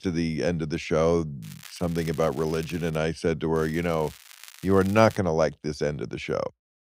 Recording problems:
crackling; faint; from 1.5 to 3 s and from 3.5 to 5 s; 20 dB below the speech

